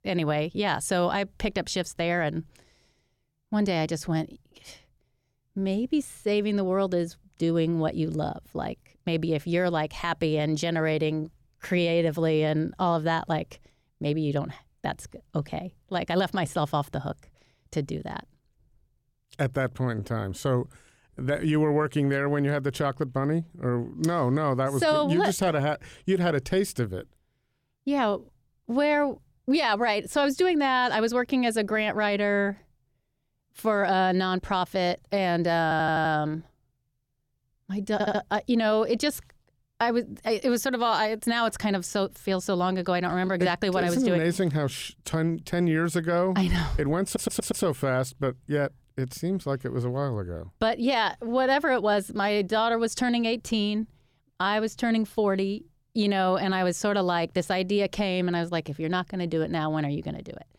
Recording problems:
audio stuttering; at 36 s, at 38 s and at 47 s

